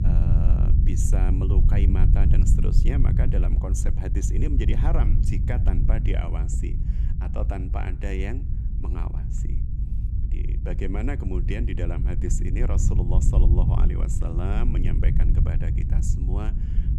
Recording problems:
low rumble; loud; throughout; 3 dB below the speech

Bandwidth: 13.5 kHz